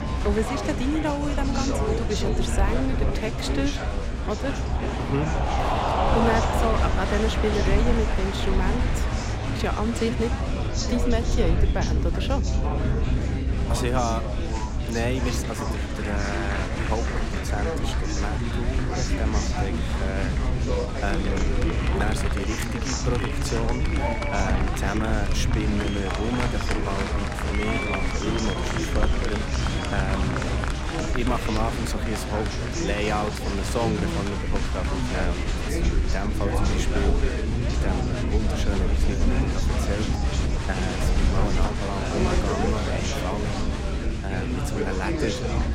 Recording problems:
chatter from many people; very loud; throughout; 1 dB above the speech
low rumble; noticeable; throughout; 10 dB below the speech

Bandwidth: 16 kHz